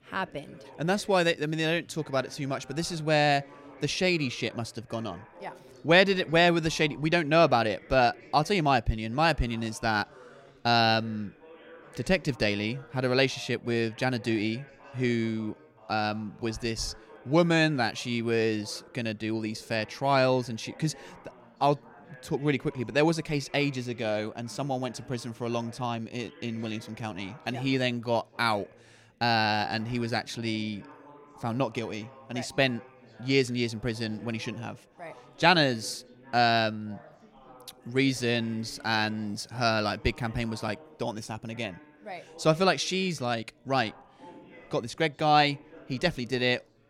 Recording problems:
background chatter; faint; throughout; 4 voices, 25 dB below the speech

